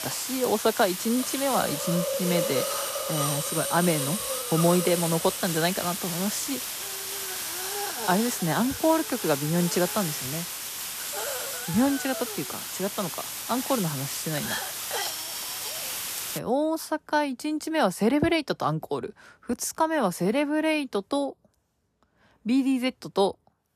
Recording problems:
hiss; loud; until 16 s; 3 dB below the speech

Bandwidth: 14.5 kHz